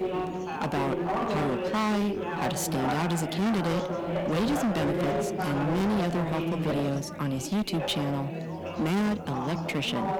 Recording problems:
distortion; heavy; 28% of the sound clipped
background chatter; loud; throughout; 4 voices, 3 dB below the speech

